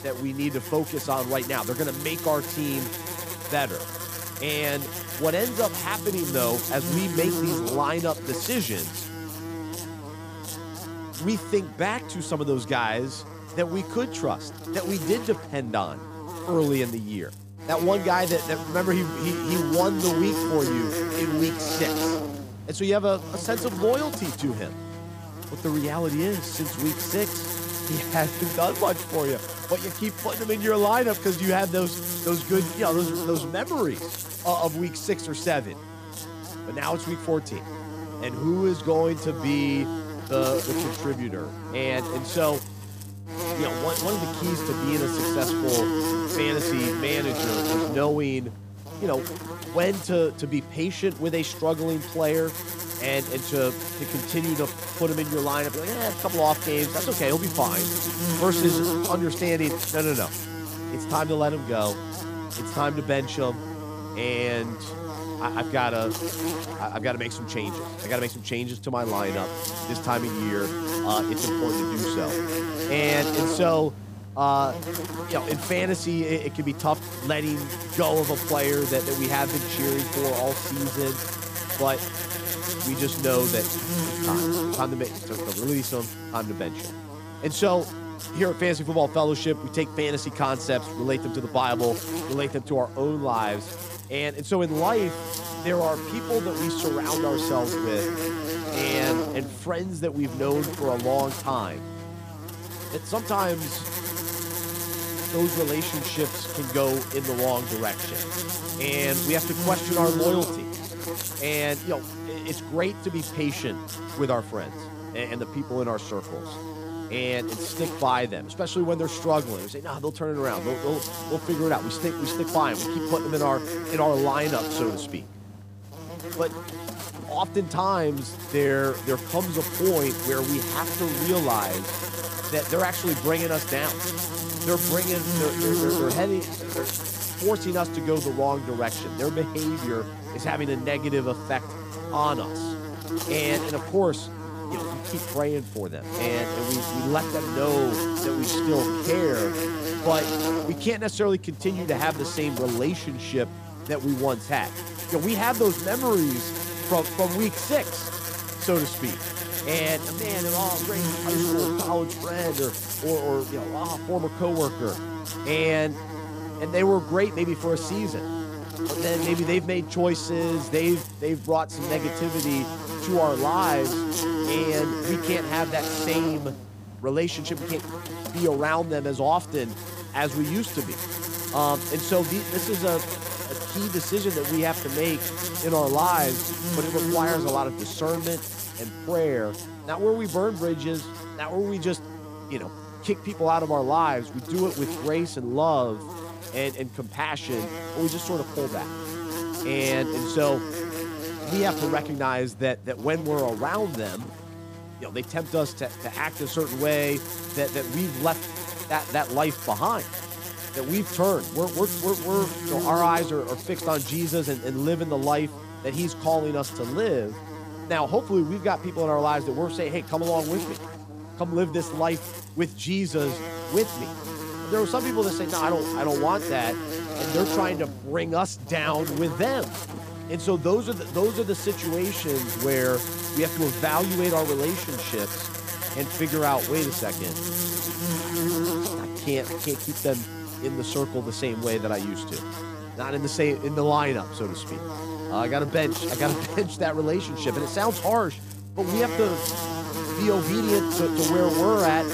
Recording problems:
electrical hum; loud; throughout; 50 Hz, 6 dB below the speech

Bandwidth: 15 kHz